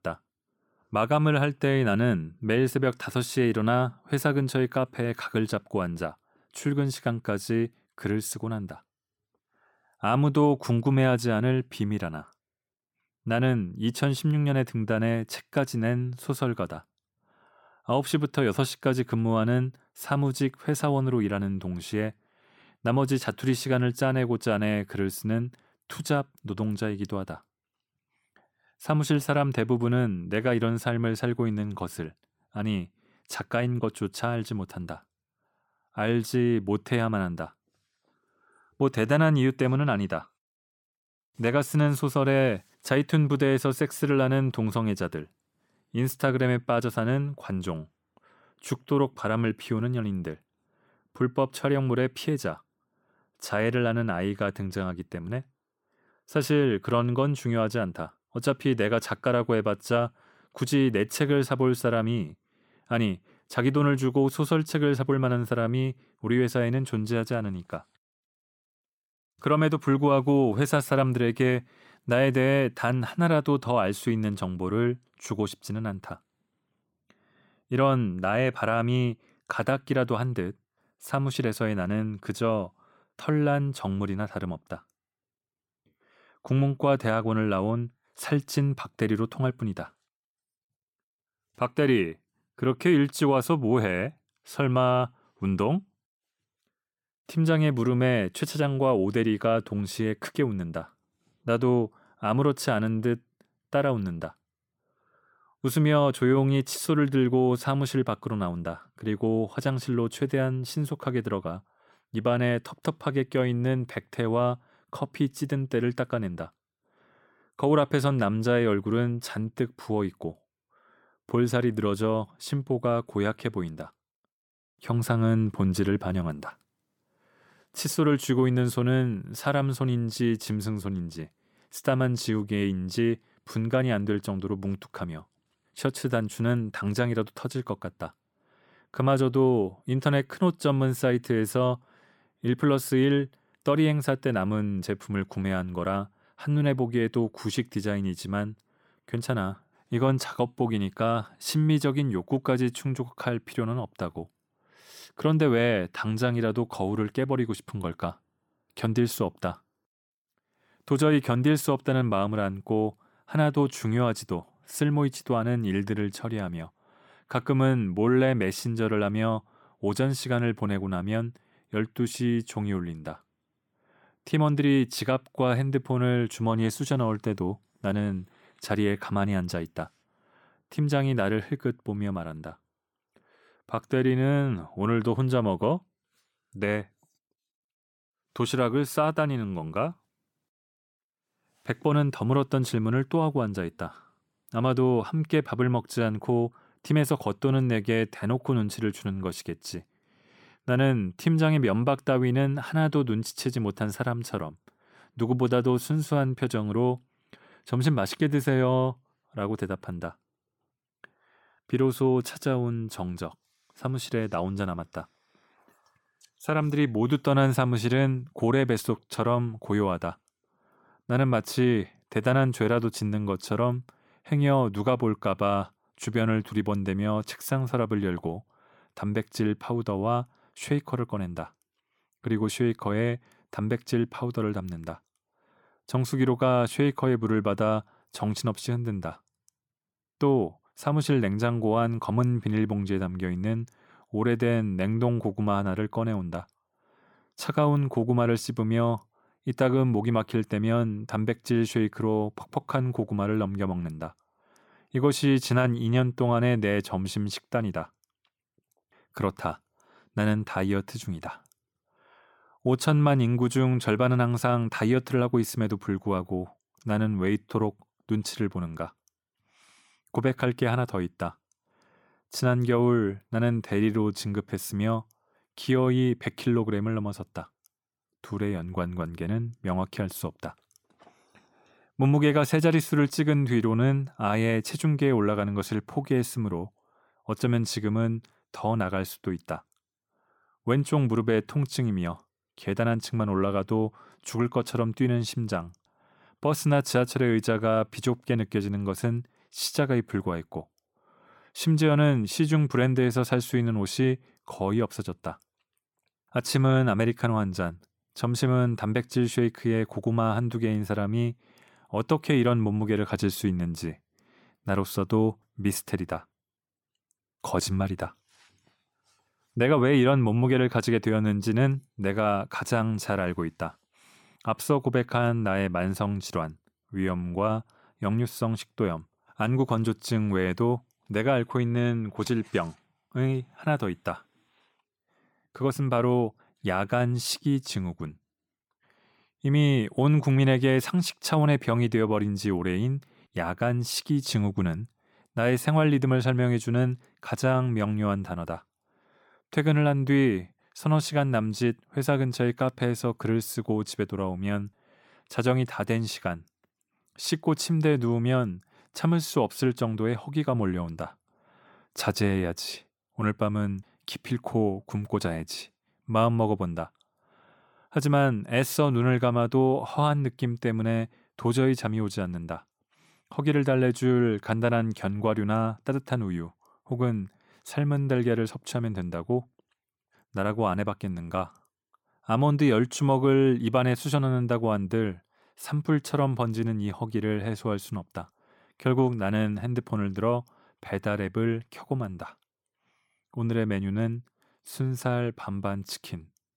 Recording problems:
none

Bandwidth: 17.5 kHz